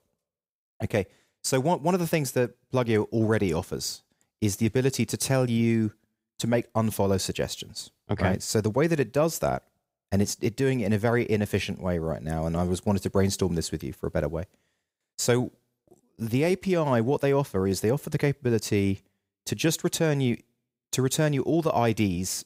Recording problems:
none

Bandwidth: 15.5 kHz